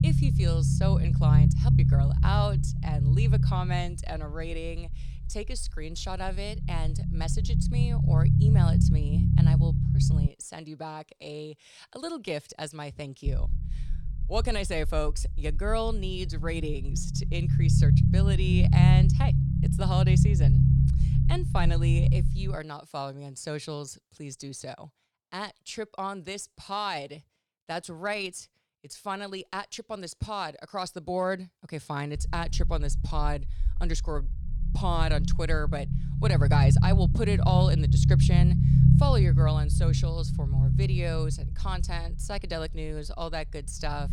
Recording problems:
low rumble; loud; until 10 s, from 13 to 23 s and from 32 s on; 1 dB below the speech

